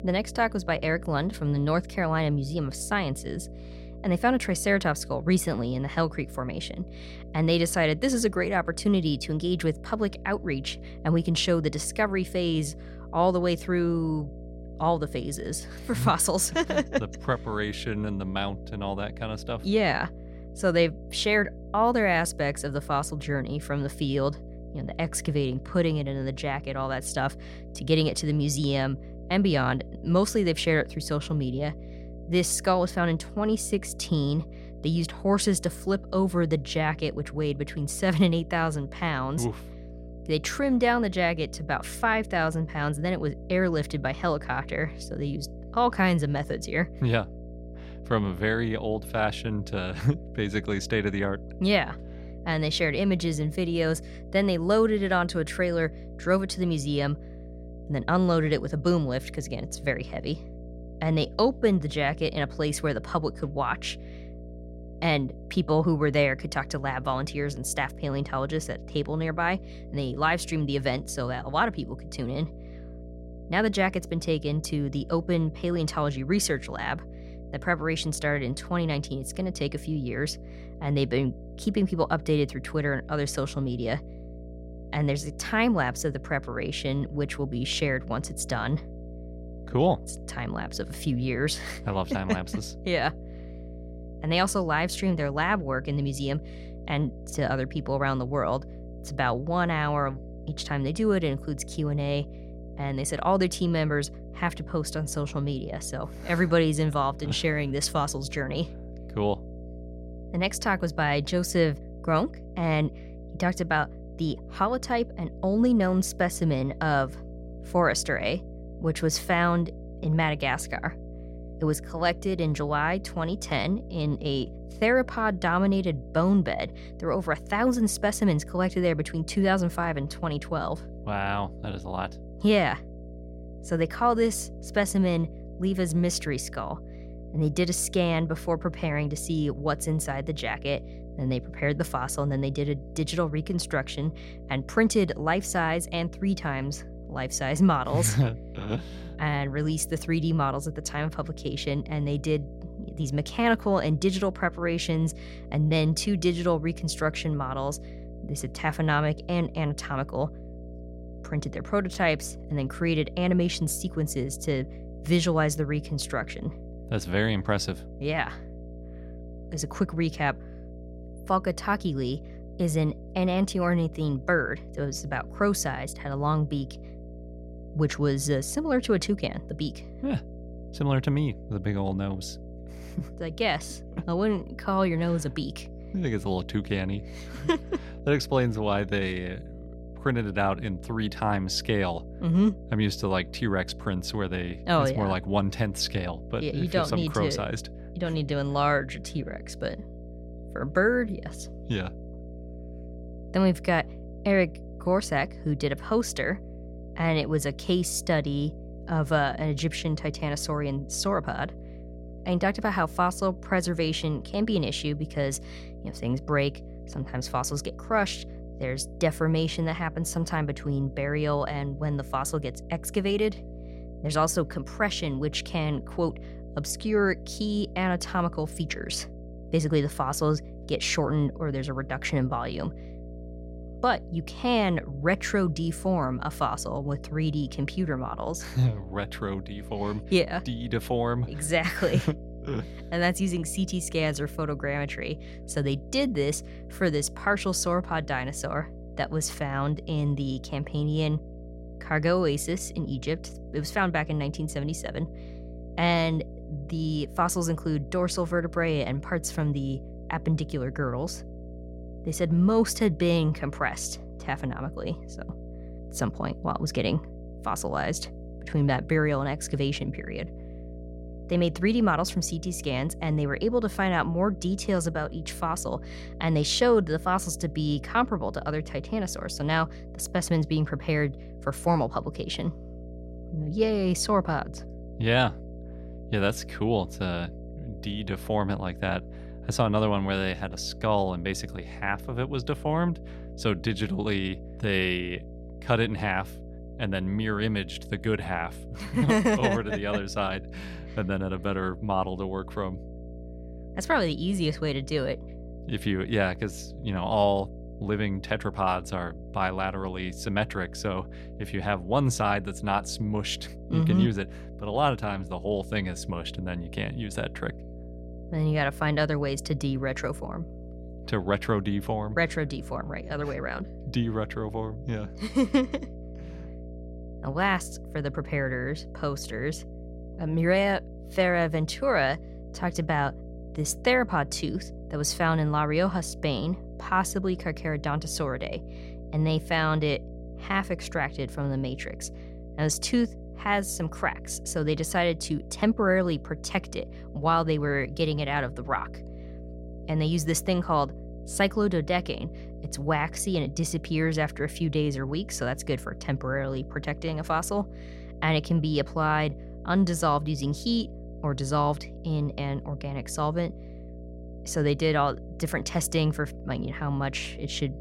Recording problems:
electrical hum; noticeable; throughout; 60 Hz, 20 dB below the speech

